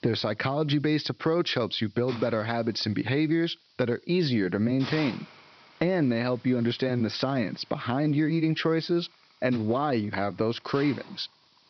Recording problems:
high frequencies cut off; noticeable; nothing above 5.5 kHz
hiss; noticeable; throughout; 20 dB below the speech

